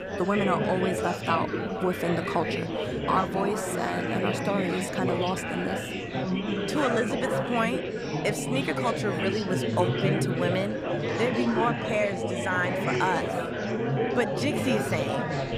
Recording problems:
chatter from many people; very loud; throughout; as loud as the speech

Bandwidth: 15 kHz